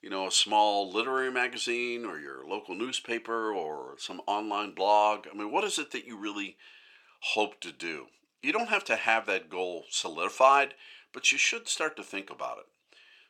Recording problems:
thin; somewhat; fading below 500 Hz

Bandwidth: 17.5 kHz